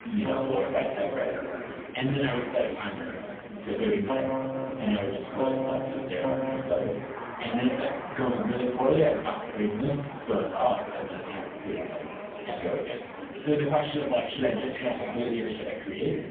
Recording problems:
phone-call audio; poor line; nothing above 3 kHz
off-mic speech; far
room echo; noticeable; dies away in 0.5 s
echo of what is said; faint; throughout; 150 ms later, 20 dB below the speech
background music; loud; throughout; 5 dB below the speech
murmuring crowd; loud; throughout; 9 dB below the speech

